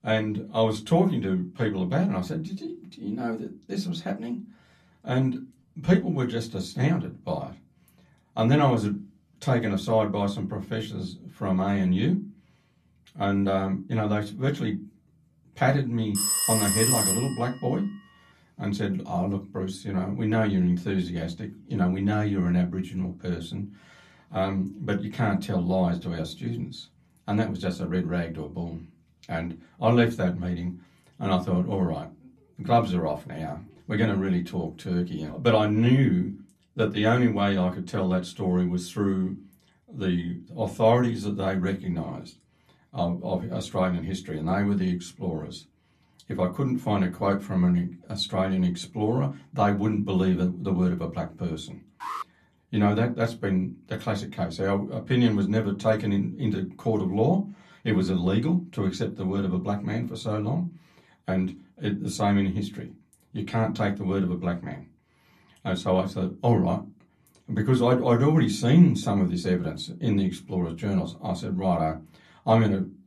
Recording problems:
off-mic speech; far
room echo; very slight; dies away in 0.2 s
phone ringing; loud; from 16 to 17 s; peak 5 dB above the speech
alarm; noticeable; at 52 s; peak 8 dB below the speech

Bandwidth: 13.5 kHz